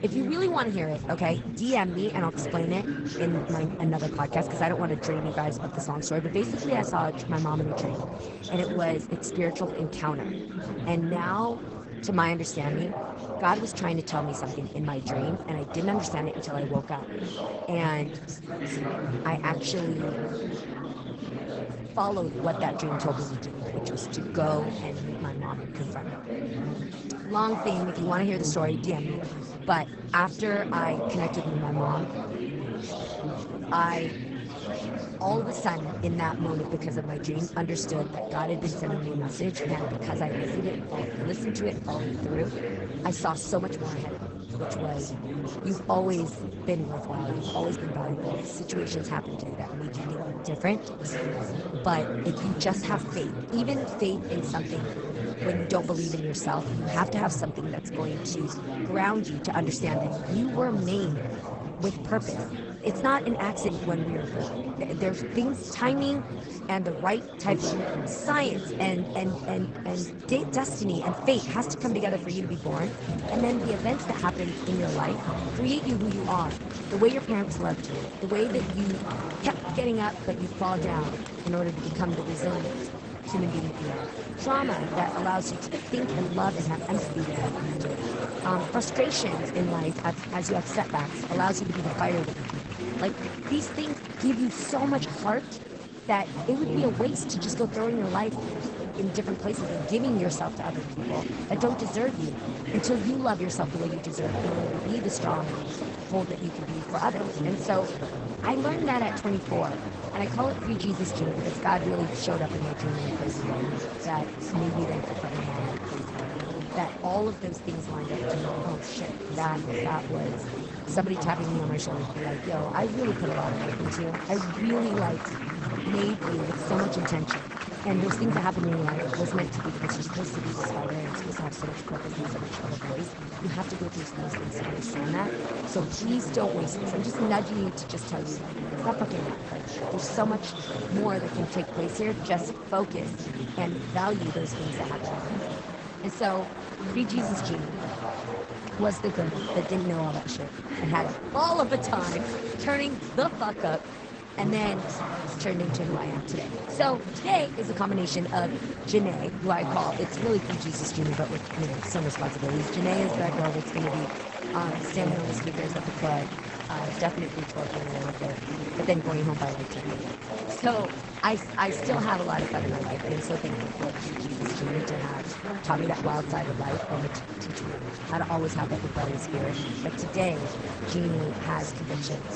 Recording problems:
garbled, watery; slightly; nothing above 8 kHz
chatter from many people; loud; throughout; 3 dB below the speech

